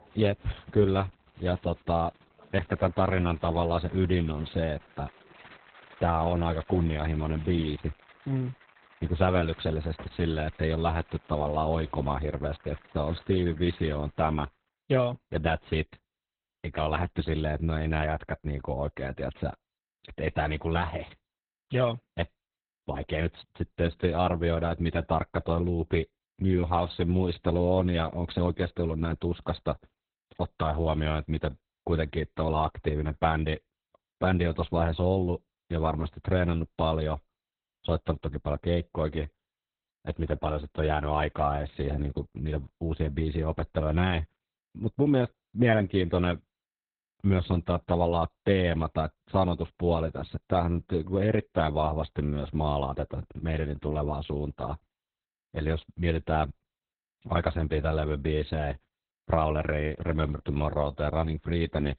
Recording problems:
garbled, watery; badly; nothing above 4 kHz
crowd noise; faint; until 14 s; 25 dB below the speech

